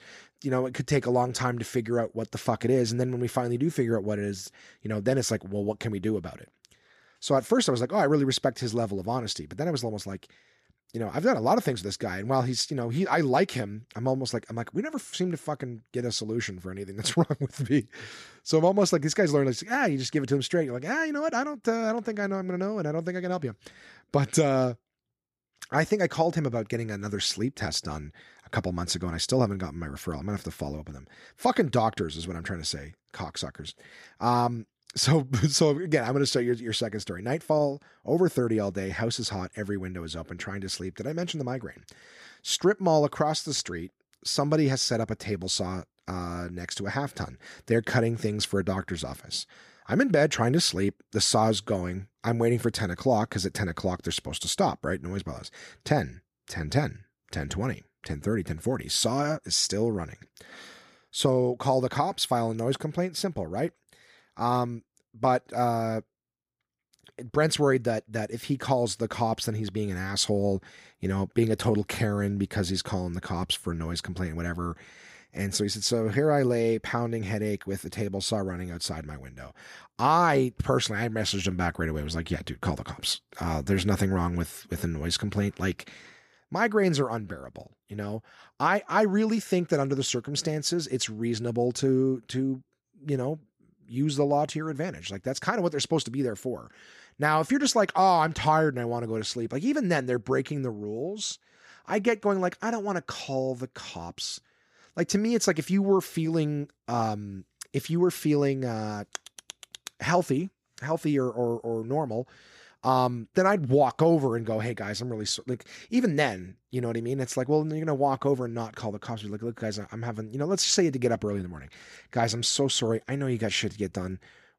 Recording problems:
none

